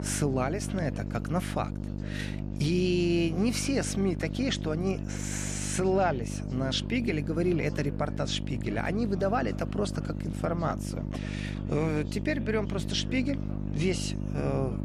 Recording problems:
electrical hum; noticeable; throughout; 50 Hz, 10 dB below the speech
background chatter; noticeable; throughout; 4 voices, 20 dB below the speech

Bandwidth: 14 kHz